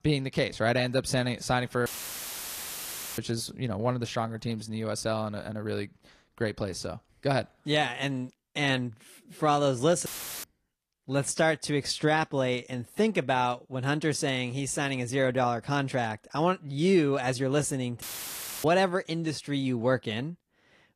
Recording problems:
garbled, watery; slightly
audio cutting out; filled with static; at 2 s for 1.5 s, at 10 s and at 18 s for 0.5 s

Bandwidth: 14.5 kHz